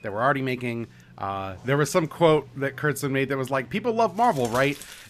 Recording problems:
household noises; faint; throughout; 20 dB below the speech

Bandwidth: 14.5 kHz